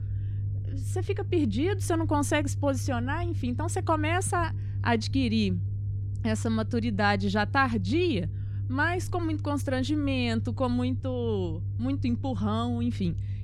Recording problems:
low rumble; noticeable; throughout; 20 dB below the speech

